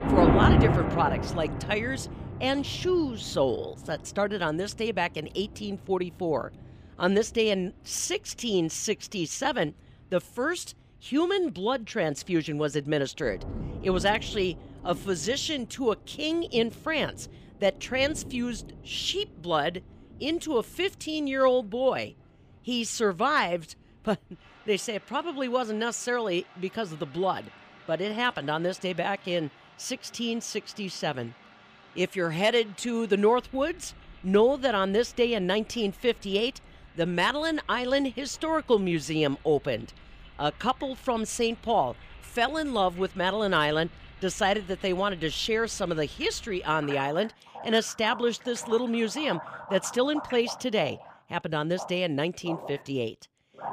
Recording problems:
rain or running water; loud; throughout; 6 dB below the speech

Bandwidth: 15 kHz